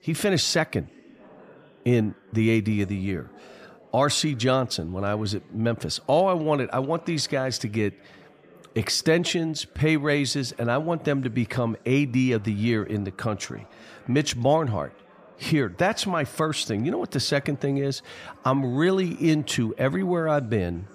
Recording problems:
background chatter; faint; throughout; 3 voices, 25 dB below the speech

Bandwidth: 14.5 kHz